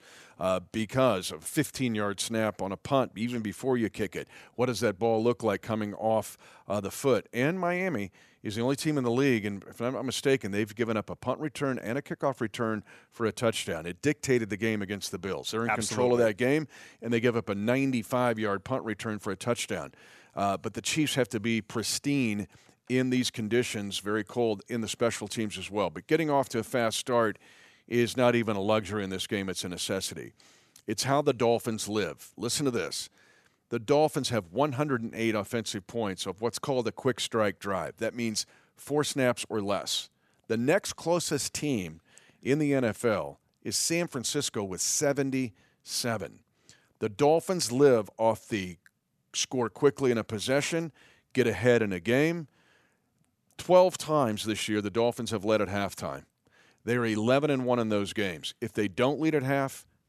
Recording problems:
none

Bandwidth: 13.5 kHz